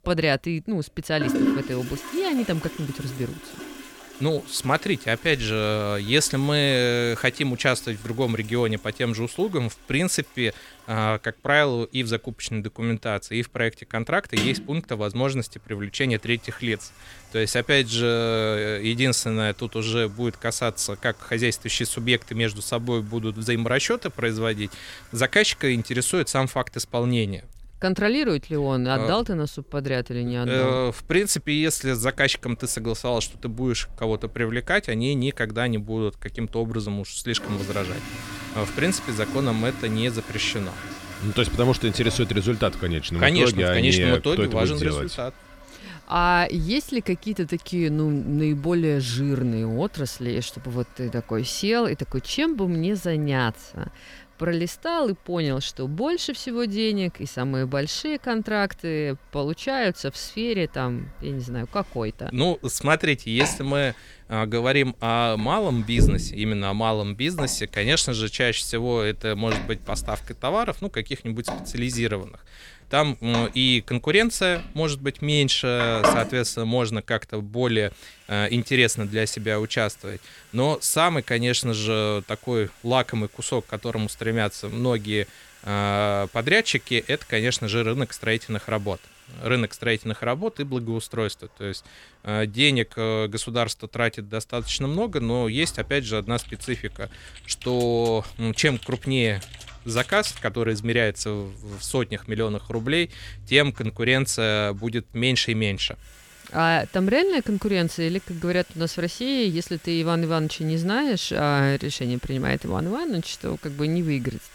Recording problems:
household noises; noticeable; throughout; 10 dB below the speech
keyboard typing; faint; from 1:36 to 1:40; peak 10 dB below the speech

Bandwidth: 18.5 kHz